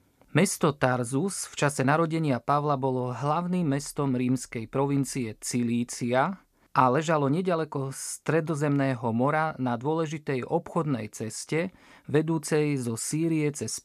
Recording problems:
none

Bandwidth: 14.5 kHz